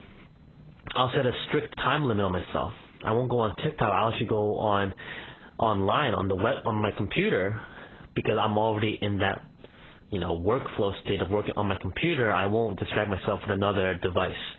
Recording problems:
garbled, watery; badly; nothing above 4 kHz
squashed, flat; heavily

